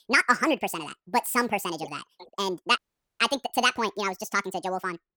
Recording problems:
wrong speed and pitch; too fast and too high; 1.7 times normal speed
audio cutting out; at 3 s

